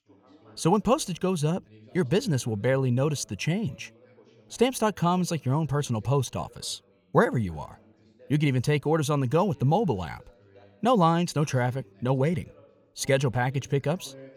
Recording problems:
background chatter; faint; throughout; 2 voices, 30 dB below the speech

